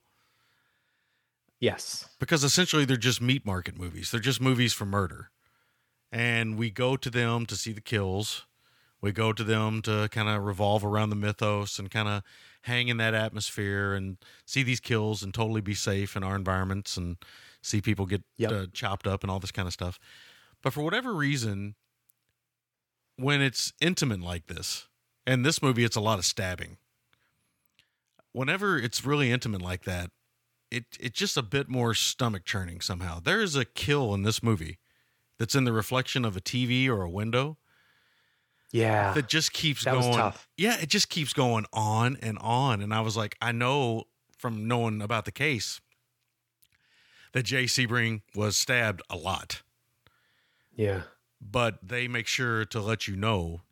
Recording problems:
none

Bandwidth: 18 kHz